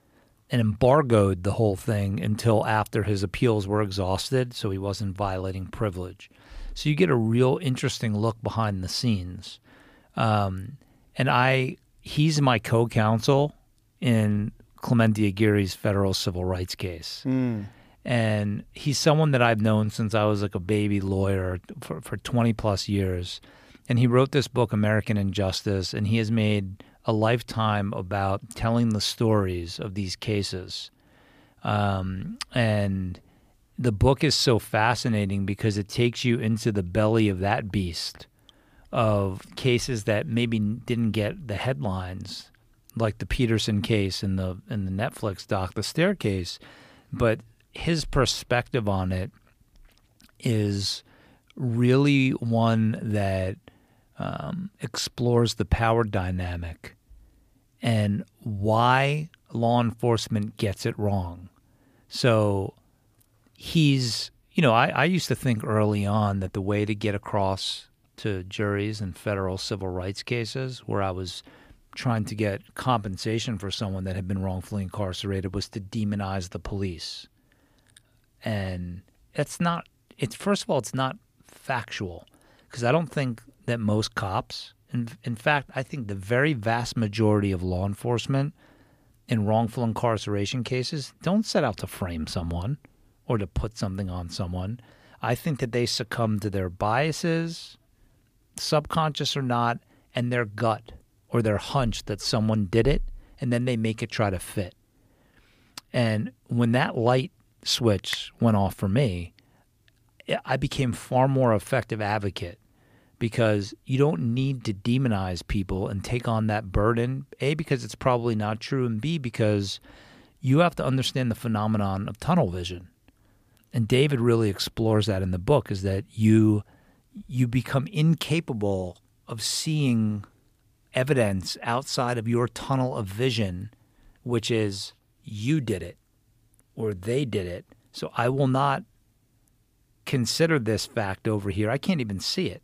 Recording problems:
none

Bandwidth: 15 kHz